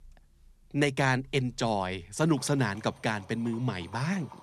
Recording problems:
animal sounds; faint; throughout; 25 dB below the speech

